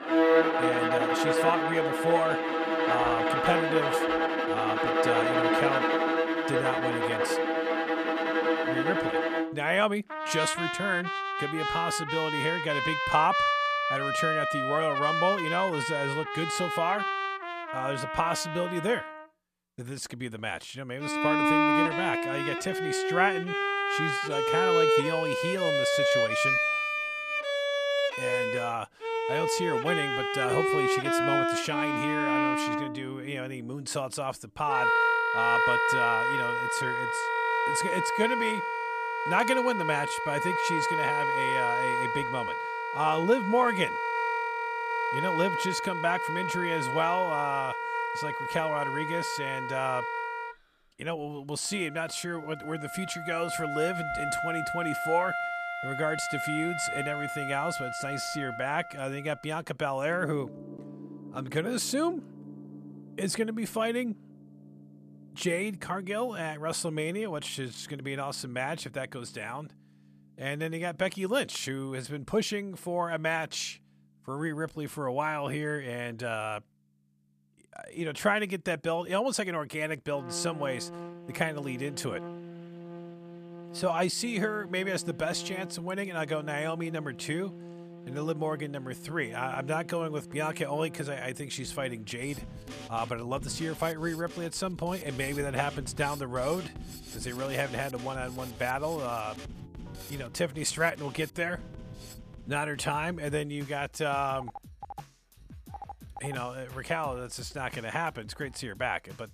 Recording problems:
background music; very loud; throughout; 4 dB above the speech
phone ringing; faint; from 1:44 to 1:46; peak 15 dB below the speech

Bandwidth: 14.5 kHz